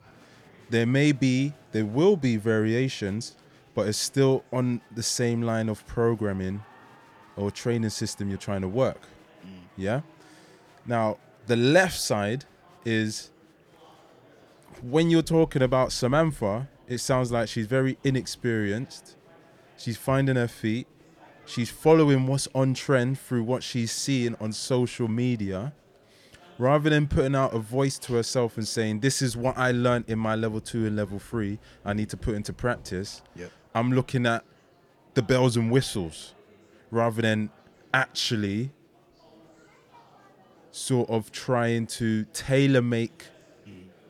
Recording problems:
murmuring crowd; faint; throughout; 30 dB below the speech

